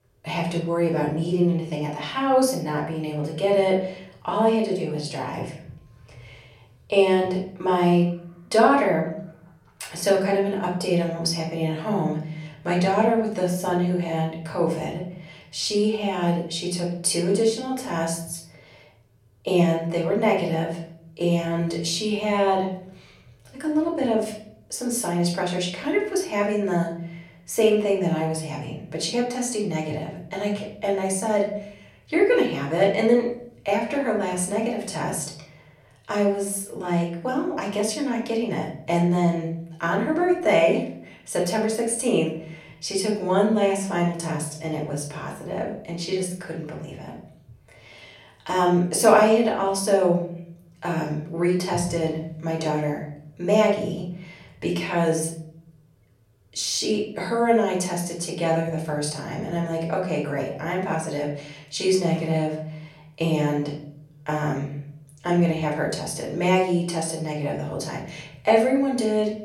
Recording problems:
off-mic speech; far
room echo; slight; dies away in 0.6 s

